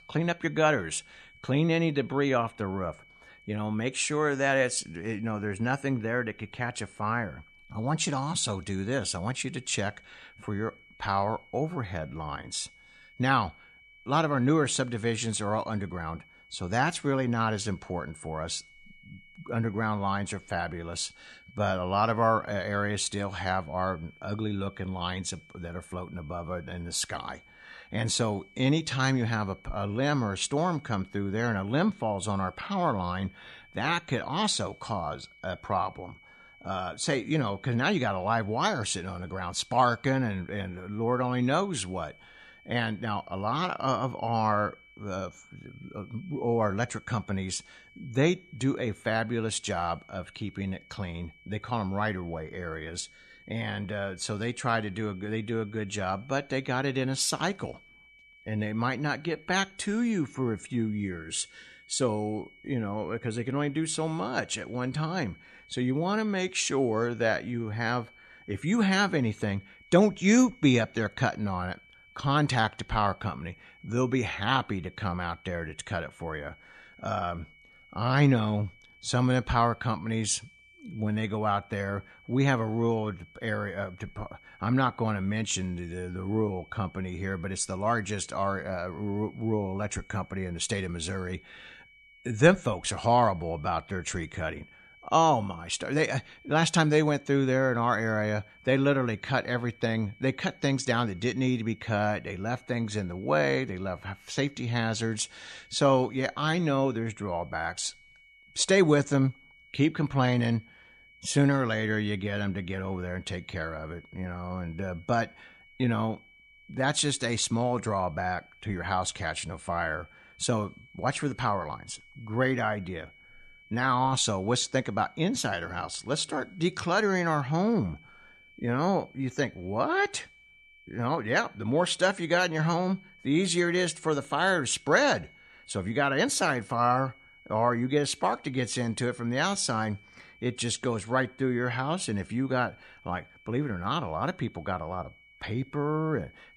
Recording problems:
high-pitched whine; faint; throughout; 2.5 kHz, 25 dB below the speech

